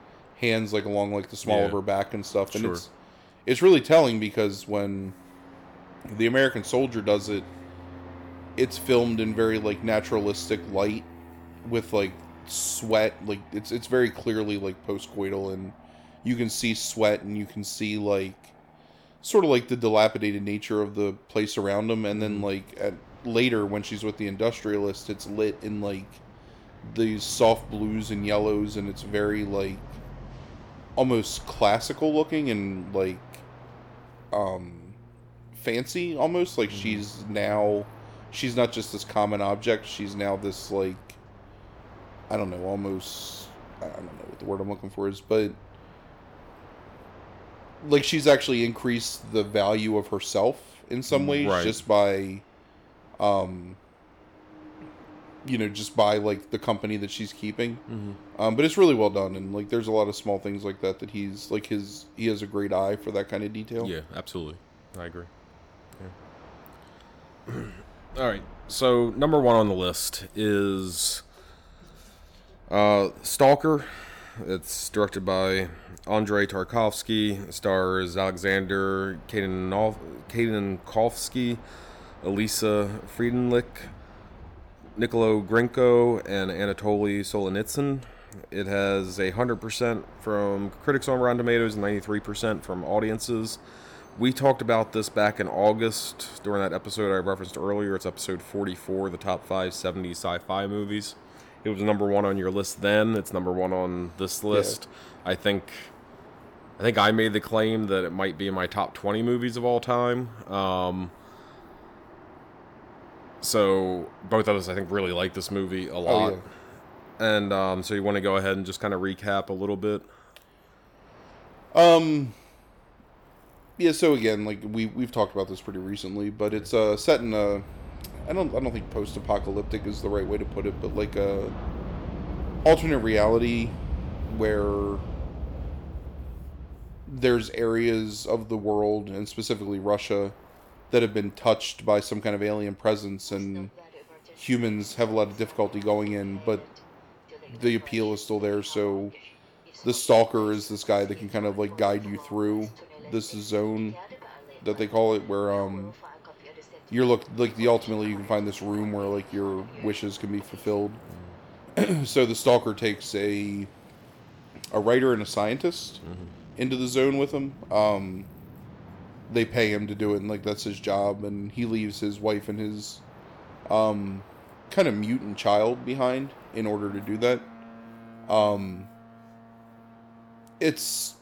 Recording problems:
train or aircraft noise; noticeable; throughout; 20 dB below the speech

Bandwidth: 18.5 kHz